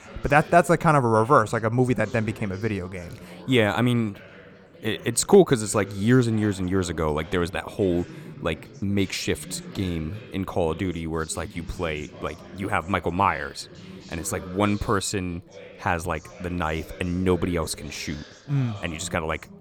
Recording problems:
background chatter; noticeable; throughout; 2 voices, 20 dB below the speech

